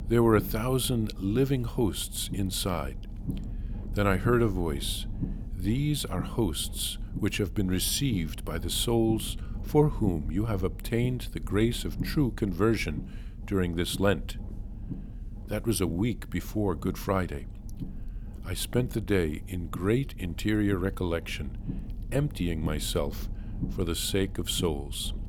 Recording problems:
low rumble; noticeable; throughout; 20 dB below the speech

